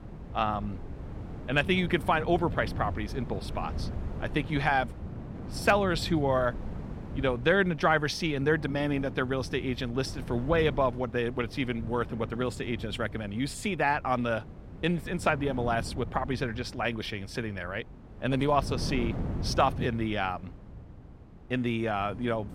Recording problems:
wind noise on the microphone; occasional gusts; 20 dB below the speech

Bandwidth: 16 kHz